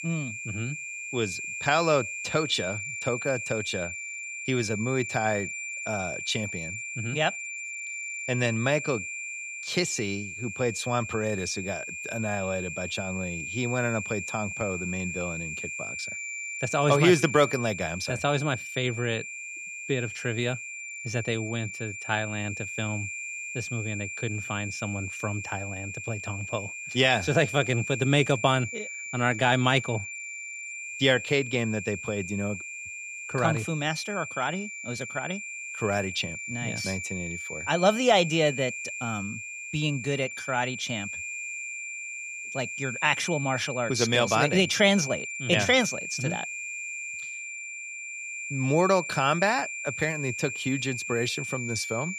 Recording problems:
high-pitched whine; loud; throughout; 2.5 kHz, 6 dB below the speech

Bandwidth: 15 kHz